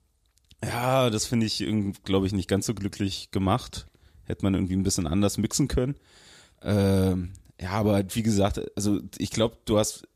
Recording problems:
none

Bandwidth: 14.5 kHz